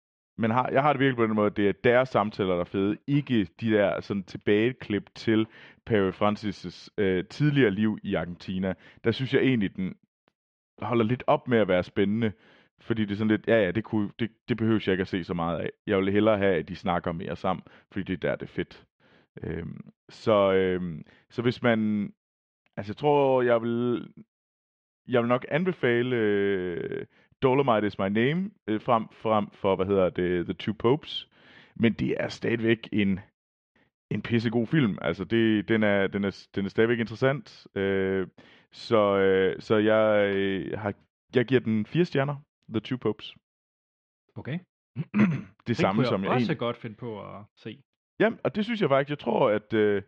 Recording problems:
muffled; very; fading above 3 kHz

